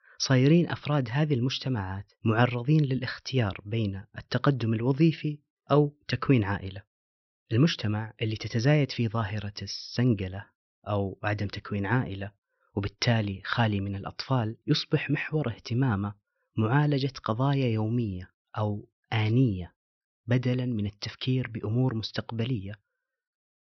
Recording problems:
high frequencies cut off; noticeable; nothing above 6 kHz

